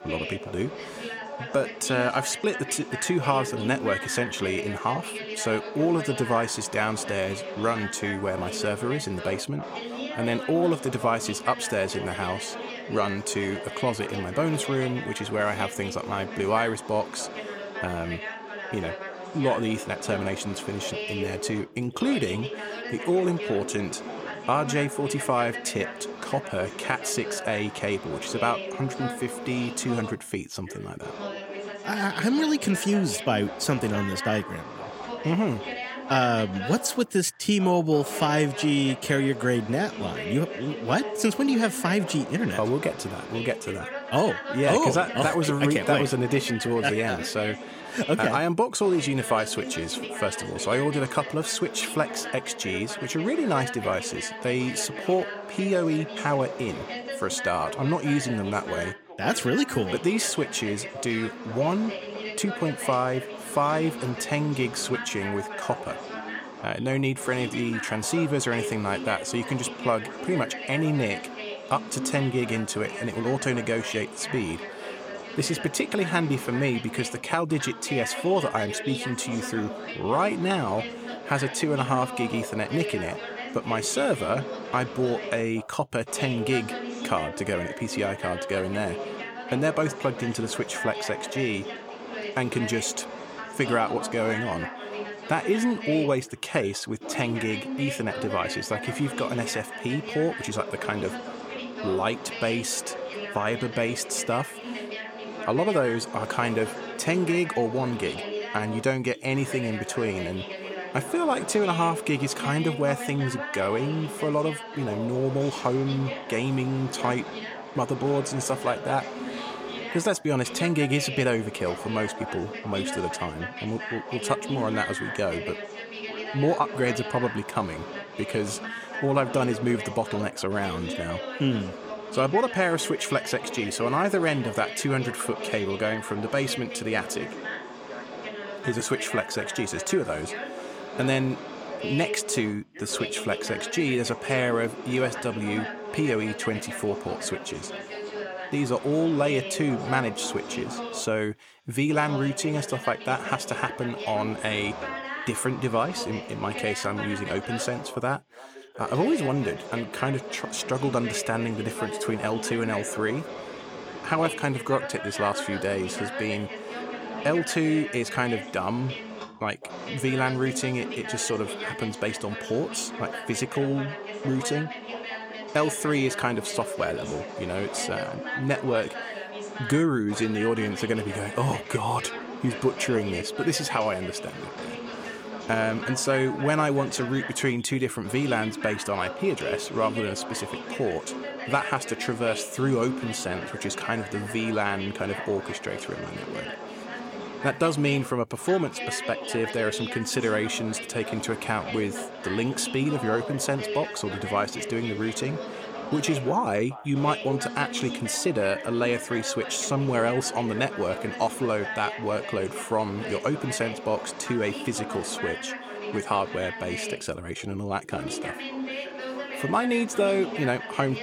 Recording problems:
background chatter; loud; throughout; 2 voices, 8 dB below the speech

